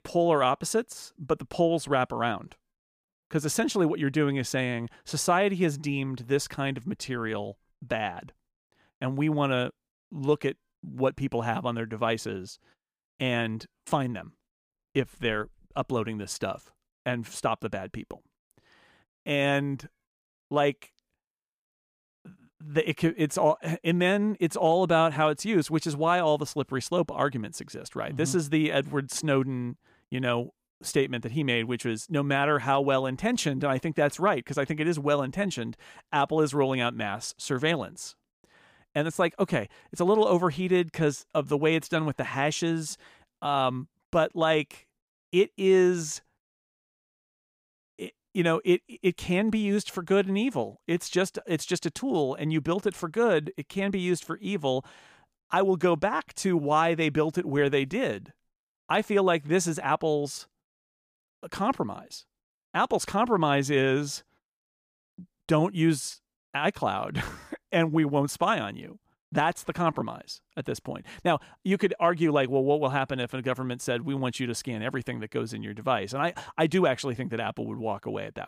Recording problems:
none

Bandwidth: 15 kHz